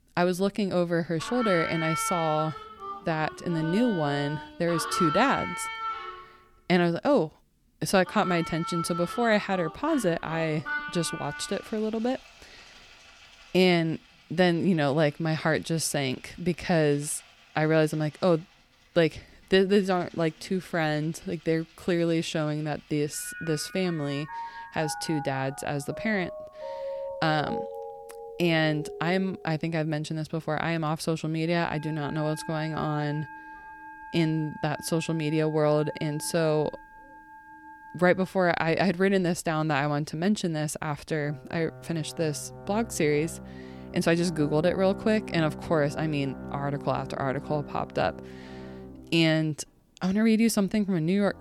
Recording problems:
background music; noticeable; throughout; 10 dB below the speech

